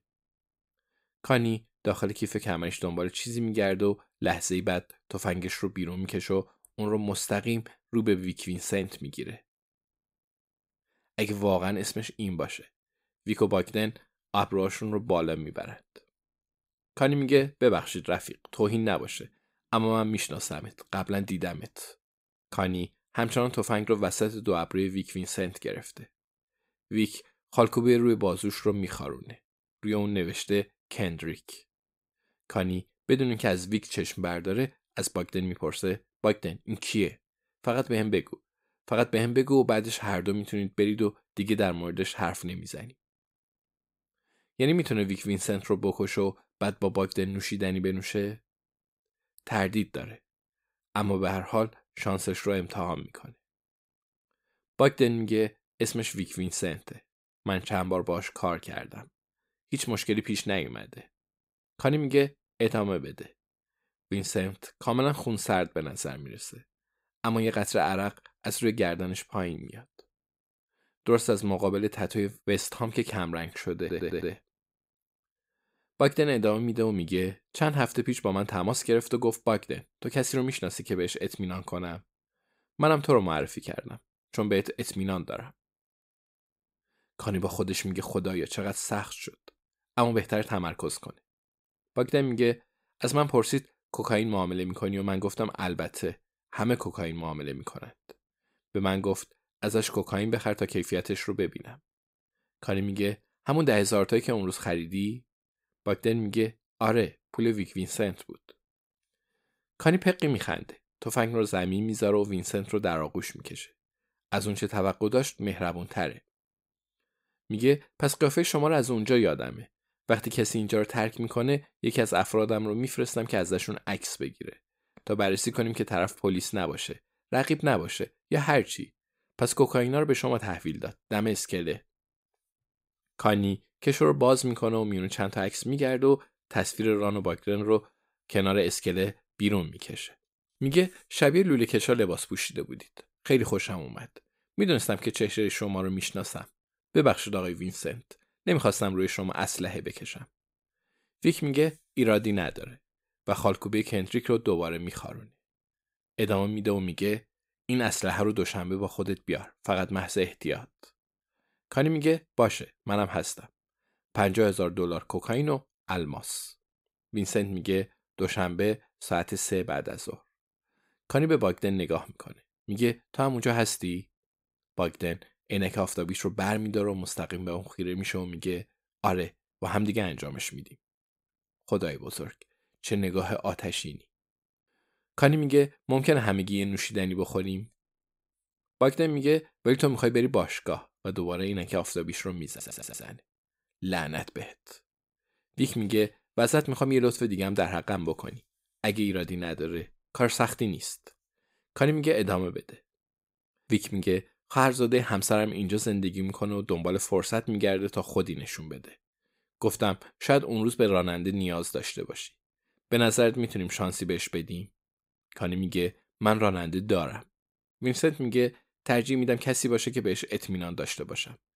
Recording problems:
audio stuttering; at 1:14 and at 3:12

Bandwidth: 15.5 kHz